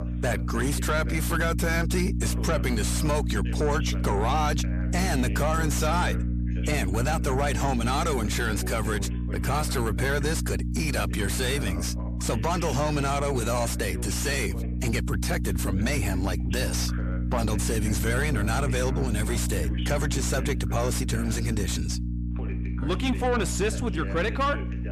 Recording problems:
distortion; heavy; 7 dB below the speech
electrical hum; noticeable; throughout; 60 Hz, 10 dB below the speech
voice in the background; noticeable; throughout; 15 dB below the speech

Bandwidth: 14.5 kHz